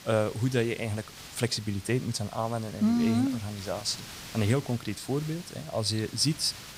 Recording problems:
hiss; noticeable; throughout; 15 dB below the speech

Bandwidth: 15.5 kHz